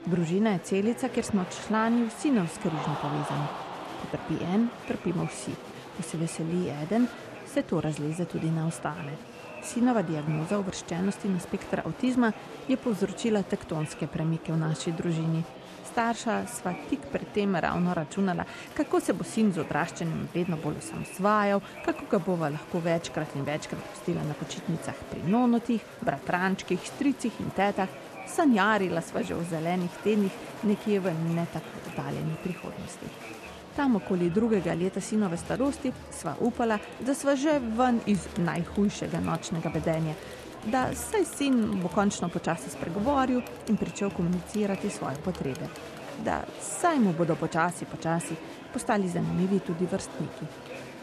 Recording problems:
echo of what is said; faint; throughout; 600 ms later, 25 dB below the speech
murmuring crowd; noticeable; throughout; 15 dB below the speech

